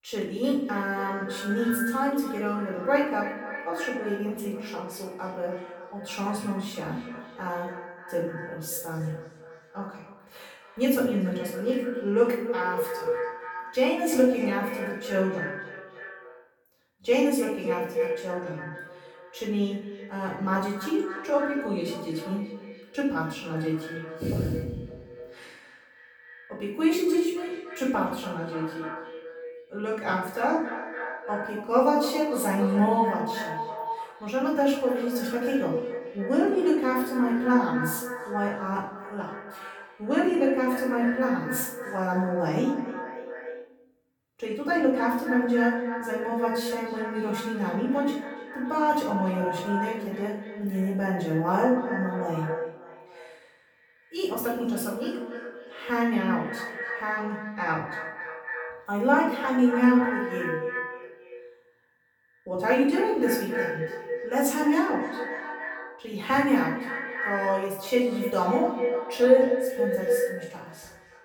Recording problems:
echo of what is said; strong; throughout; 280 ms later, 8 dB below the speech
off-mic speech; far
room echo; noticeable; dies away in 0.6 s

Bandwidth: 18.5 kHz